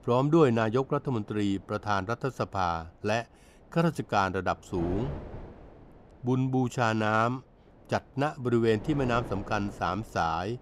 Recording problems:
wind noise on the microphone; occasional gusts; 20 dB below the speech

